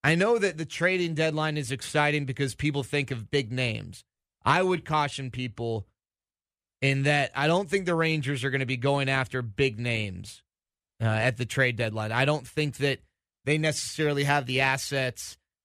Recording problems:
none

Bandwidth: 14.5 kHz